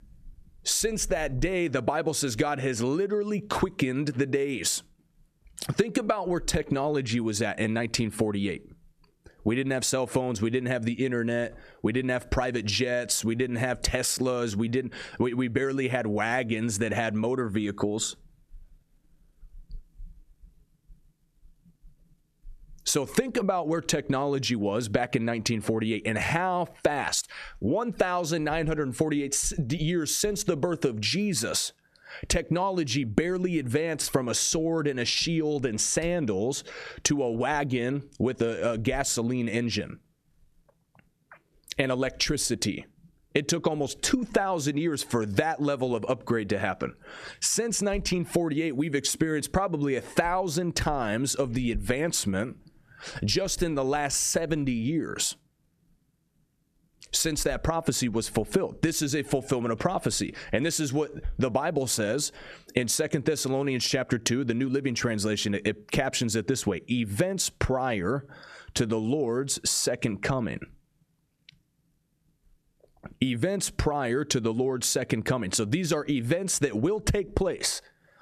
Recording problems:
squashed, flat; somewhat

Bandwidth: 14 kHz